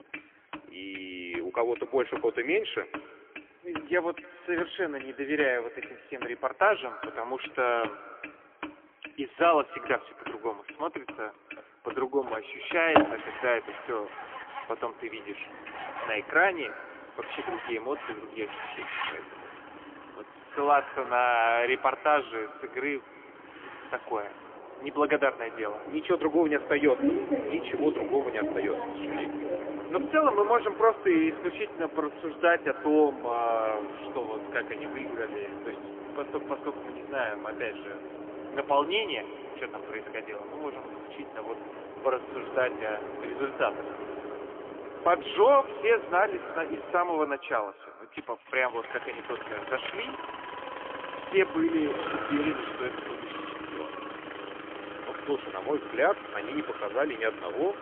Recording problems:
phone-call audio; poor line; nothing above 3.5 kHz
echo of what is said; faint; throughout; 280 ms later, 20 dB below the speech
traffic noise; loud; throughout; 9 dB below the speech

